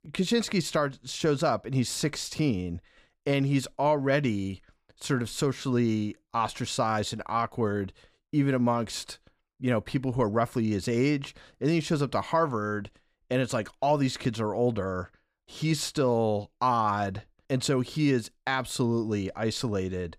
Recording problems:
none

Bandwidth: 15.5 kHz